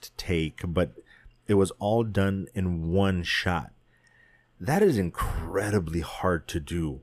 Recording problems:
none

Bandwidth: 14.5 kHz